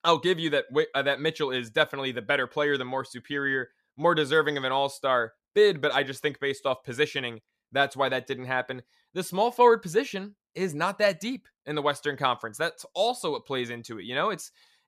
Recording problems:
none

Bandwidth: 14.5 kHz